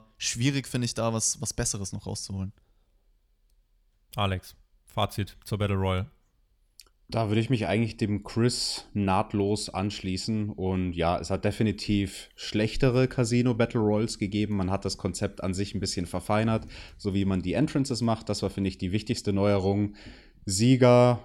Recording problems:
none

